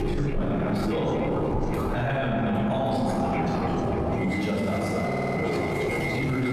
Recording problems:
echo of what is said; strong; throughout; 120 ms later, 10 dB below the speech
room echo; strong; dies away in 2.1 s
off-mic speech; far
squashed, flat; heavily
train or aircraft noise; loud; throughout; 2 dB below the speech
audio stuttering; at 5 s

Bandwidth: 14.5 kHz